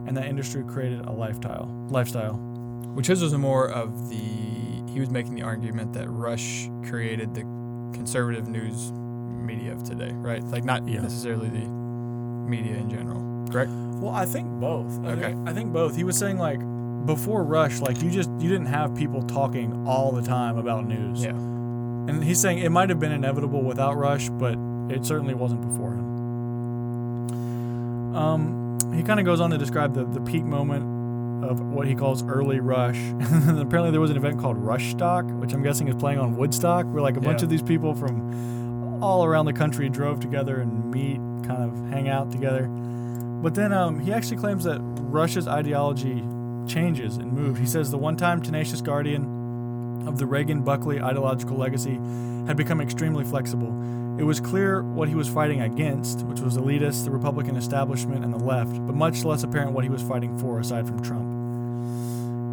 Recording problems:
electrical hum; loud; throughout; 60 Hz, 9 dB below the speech

